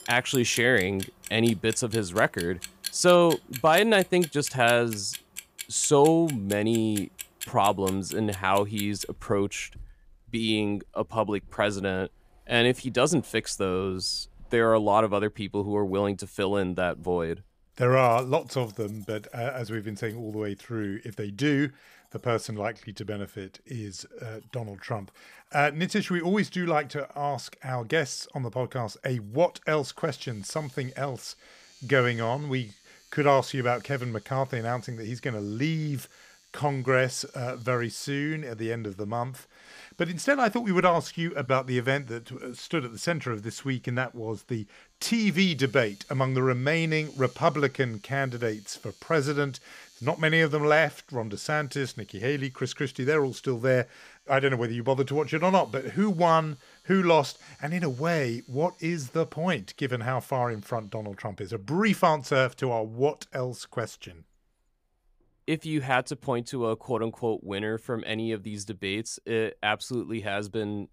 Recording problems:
household noises; noticeable; throughout; 15 dB below the speech

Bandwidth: 15 kHz